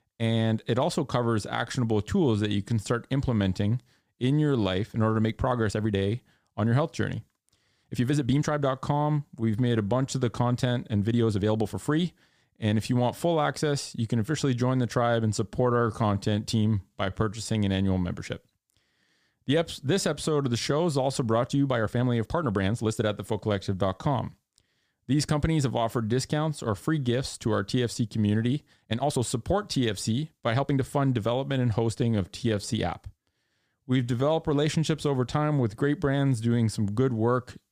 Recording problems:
uneven, jittery; strongly; from 2.5 to 34 s

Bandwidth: 15 kHz